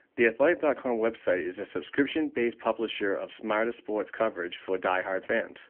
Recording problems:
phone-call audio; nothing above 3 kHz

